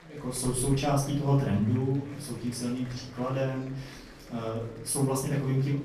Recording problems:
off-mic speech; far
room echo; noticeable; dies away in 0.6 s
murmuring crowd; noticeable; throughout; 20 dB below the speech

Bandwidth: 14.5 kHz